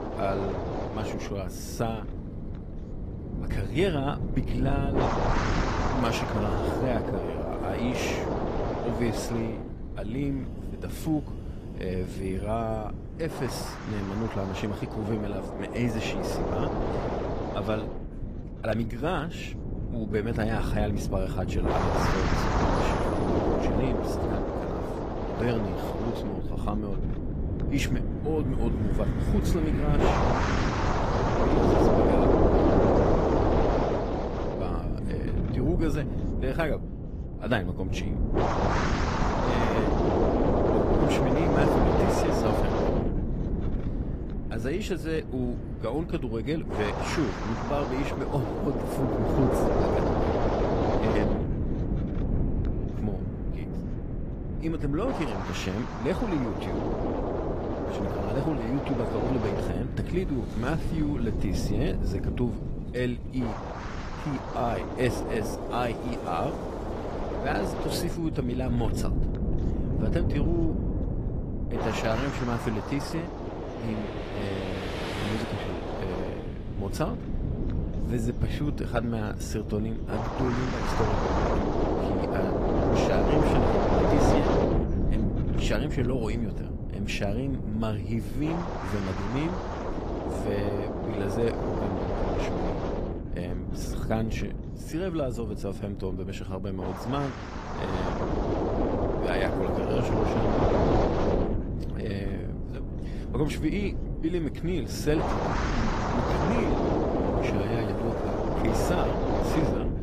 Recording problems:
garbled, watery; slightly; nothing above 15 kHz
wind noise on the microphone; heavy; 4 dB above the speech
traffic noise; noticeable; throughout; 15 dB below the speech

